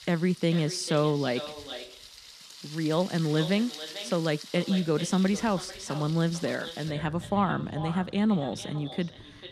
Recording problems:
echo of what is said; noticeable; throughout; 440 ms later, 15 dB below the speech
rain or running water; noticeable; throughout; 15 dB below the speech

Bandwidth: 14.5 kHz